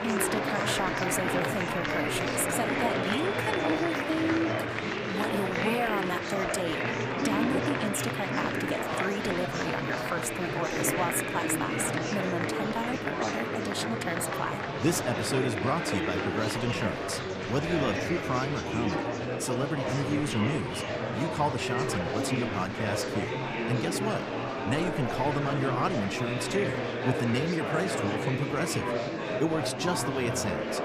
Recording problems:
murmuring crowd; very loud; throughout; 1 dB above the speech

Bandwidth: 15 kHz